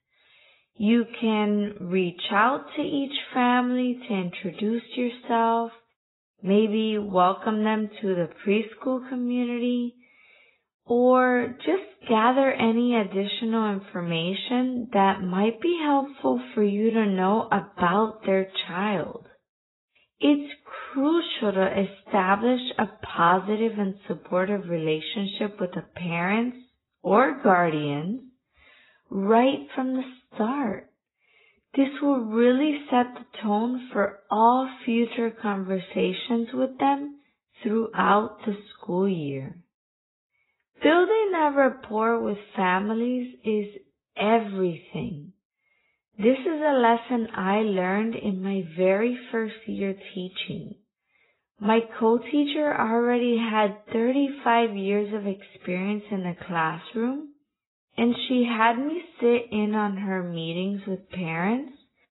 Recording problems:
garbled, watery; badly; nothing above 4 kHz
wrong speed, natural pitch; too slow; 0.7 times normal speed

